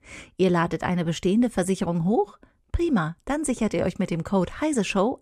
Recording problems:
none

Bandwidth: 14.5 kHz